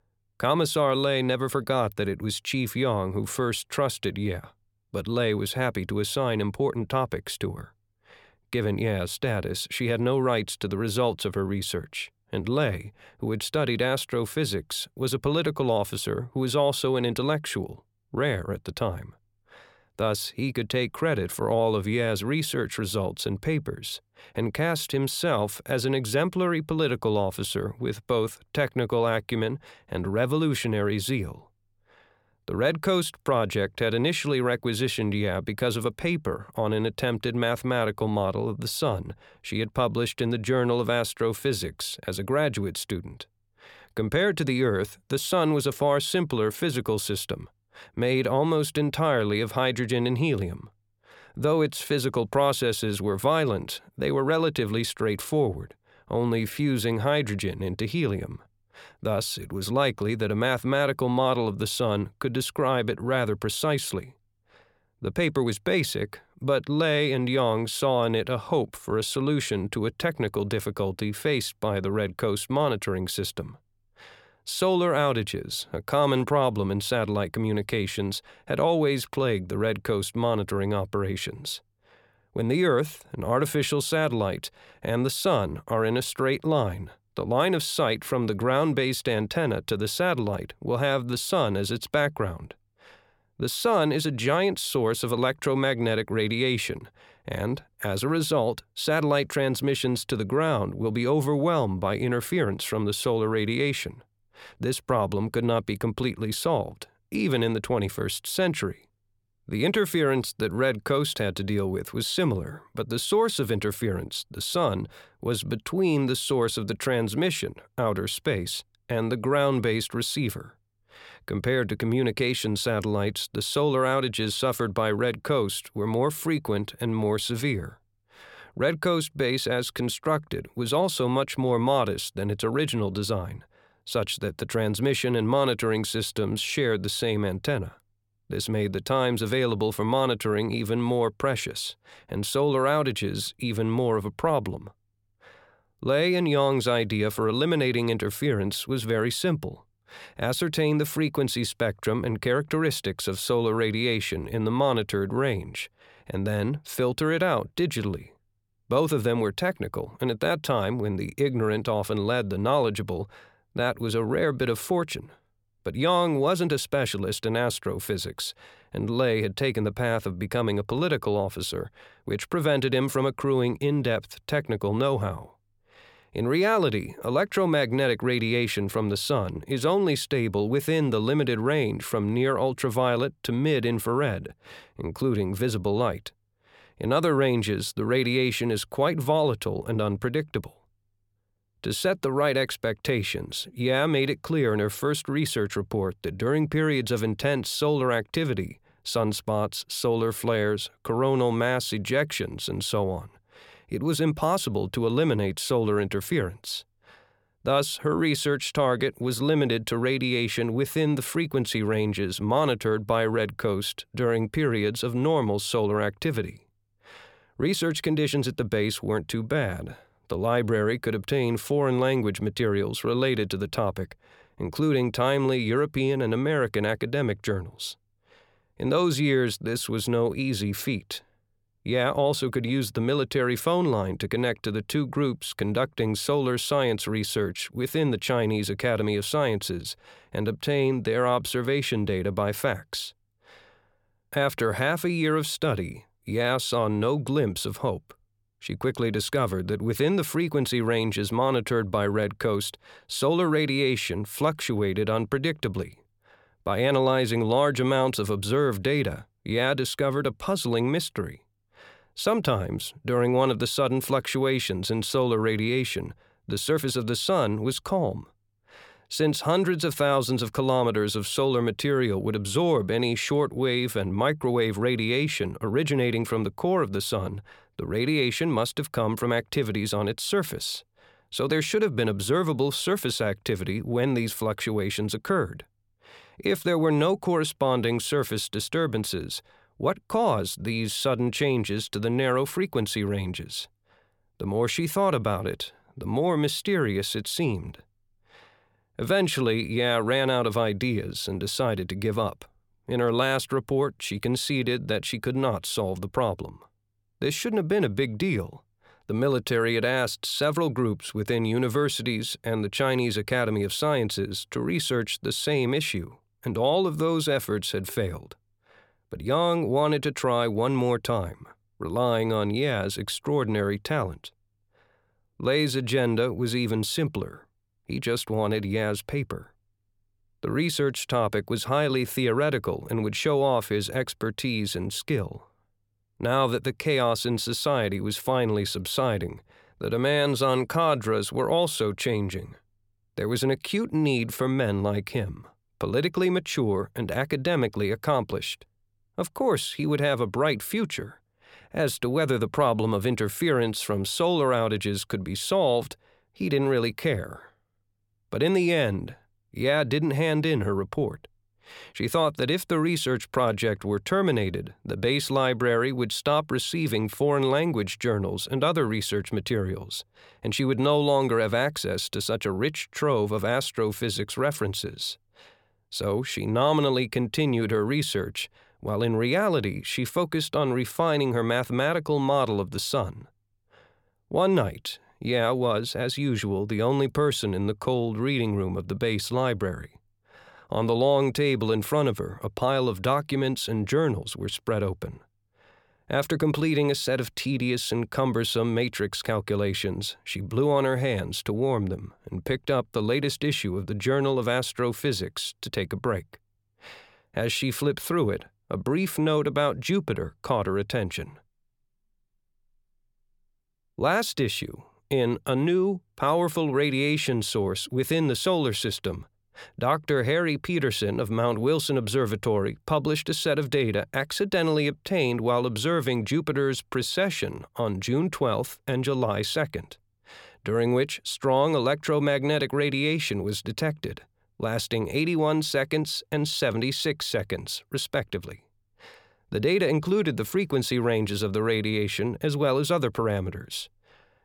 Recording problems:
none

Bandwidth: 17.5 kHz